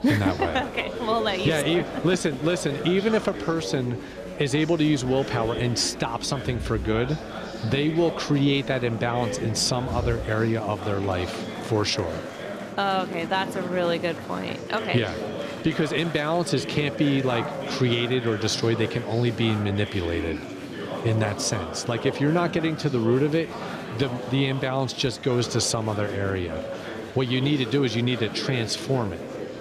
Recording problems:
murmuring crowd; loud; throughout; 8 dB below the speech

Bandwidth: 14.5 kHz